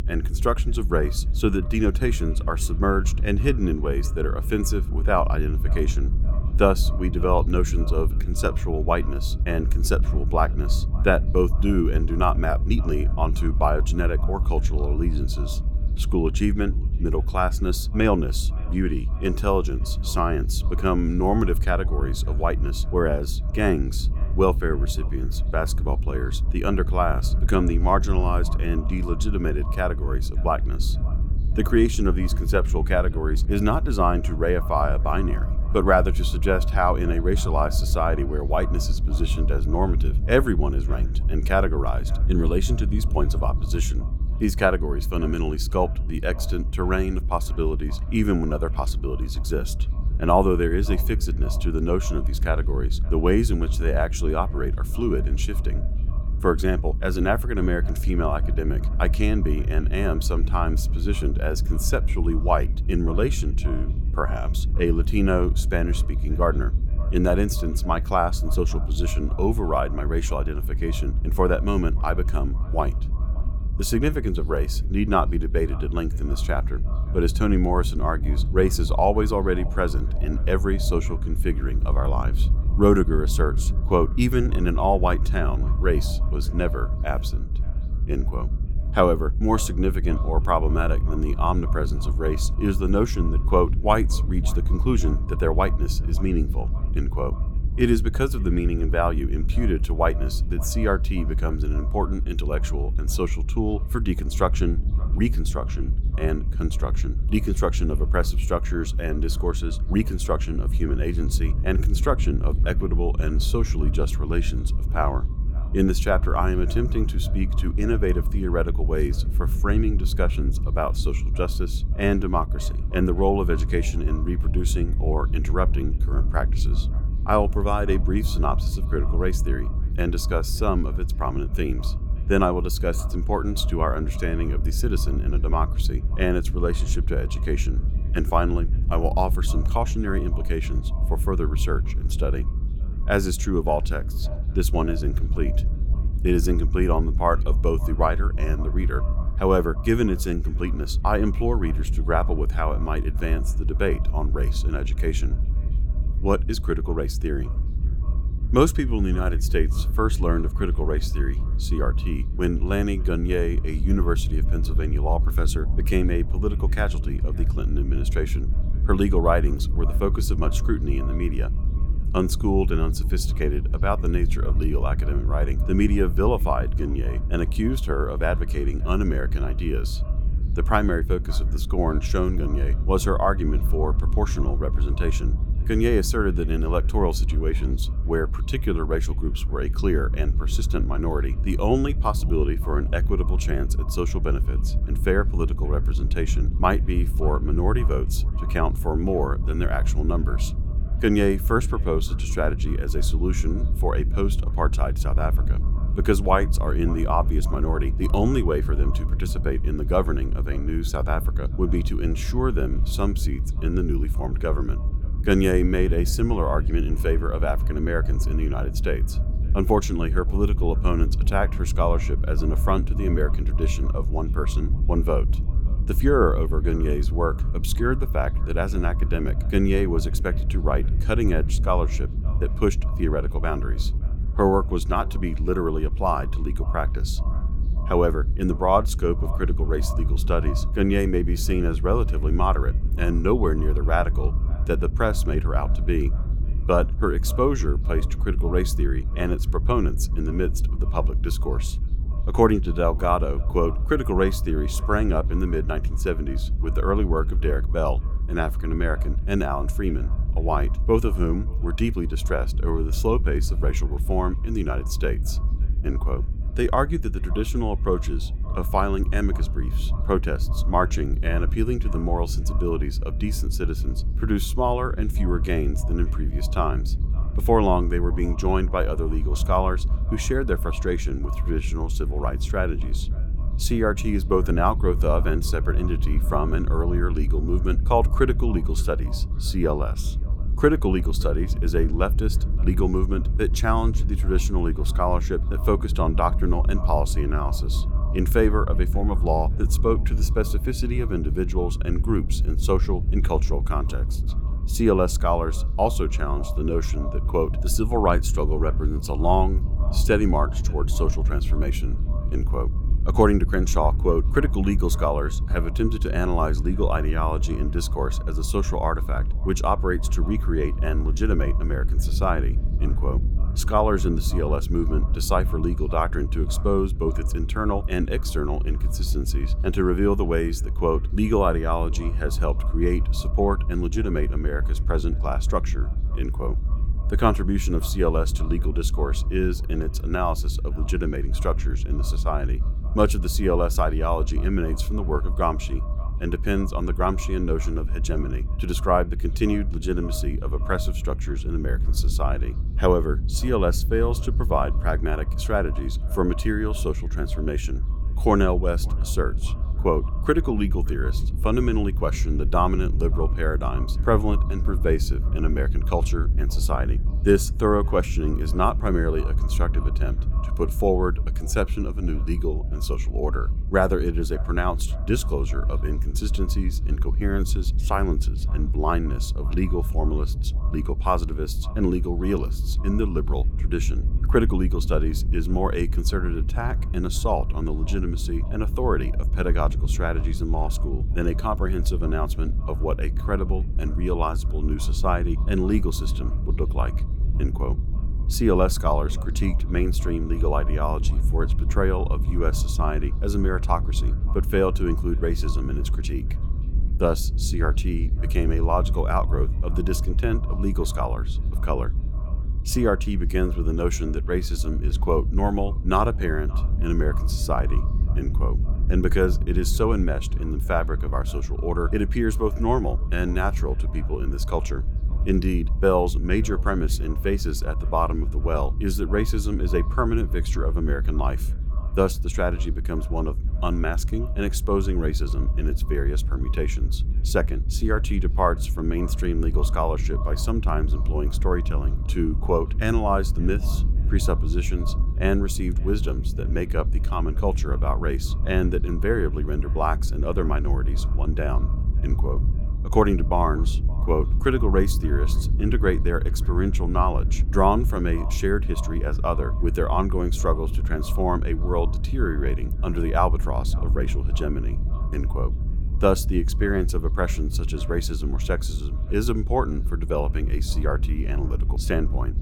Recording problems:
echo of what is said; faint; throughout; 570 ms later, 20 dB below the speech
low rumble; noticeable; throughout; 15 dB below the speech

